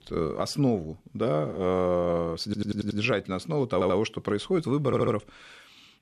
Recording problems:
audio stuttering; at 2.5 s, at 3.5 s and at 5 s

